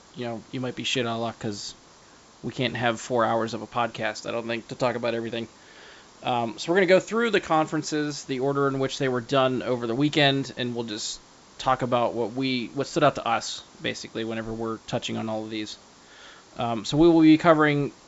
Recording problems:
high frequencies cut off; noticeable; nothing above 8 kHz
hiss; faint; throughout; 25 dB below the speech

